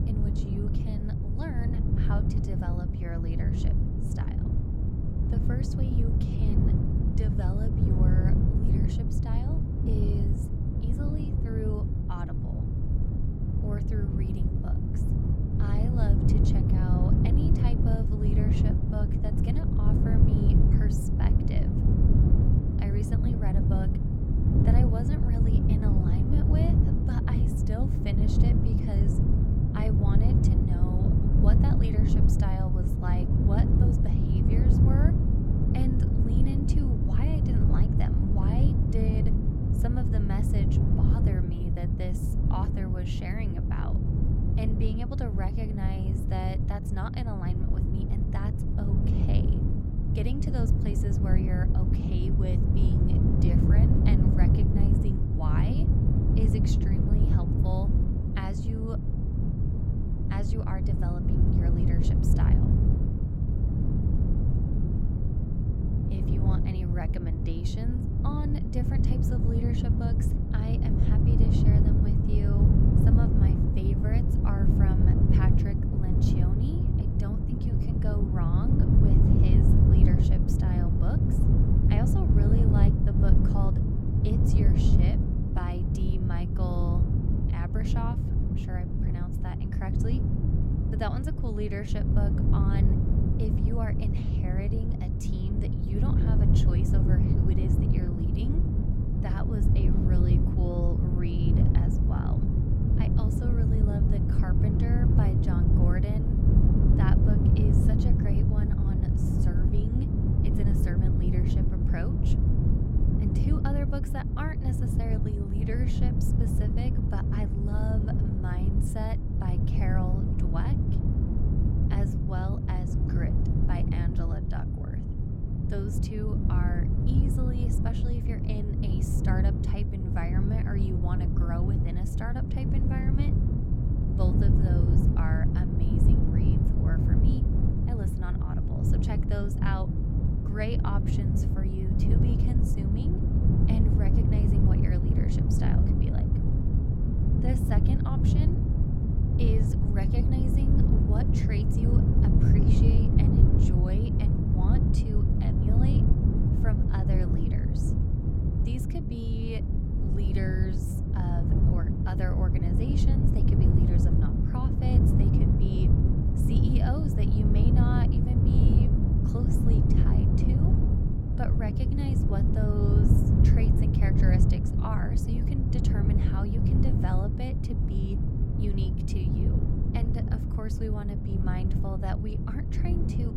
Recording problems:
wind noise on the microphone; heavy; 4 dB above the speech

